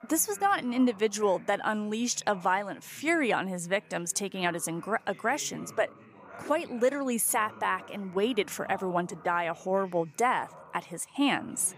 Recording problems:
voice in the background; faint; throughout; 20 dB below the speech

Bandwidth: 15 kHz